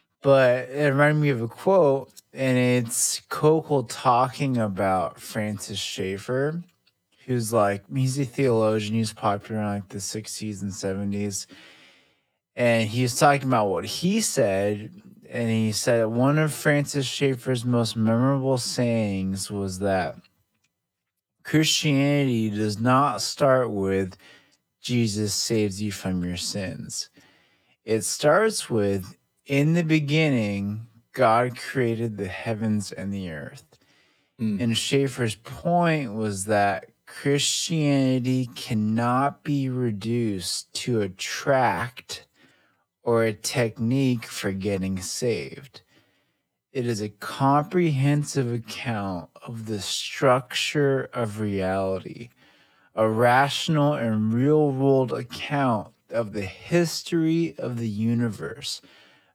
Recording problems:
wrong speed, natural pitch; too slow; 0.6 times normal speed

